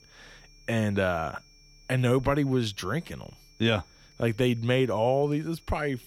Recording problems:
high-pitched whine; faint; throughout; 5.5 kHz, 30 dB below the speech

